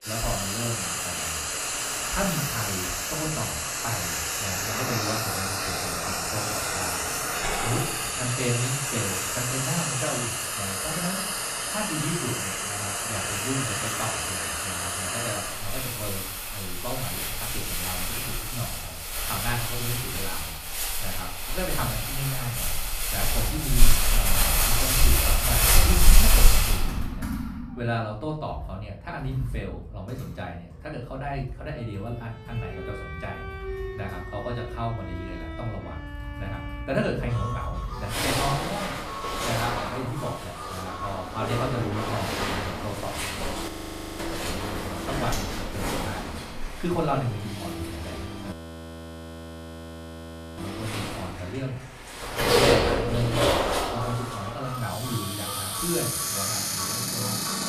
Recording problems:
off-mic speech; far
room echo; slight; dies away in 0.4 s
household noises; very loud; throughout; 7 dB above the speech
background music; loud; from 32 s on; 6 dB below the speech
chatter from many people; faint; throughout; 30 dB below the speech
audio freezing; at 44 s for 0.5 s and at 49 s for 2 s

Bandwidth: 14.5 kHz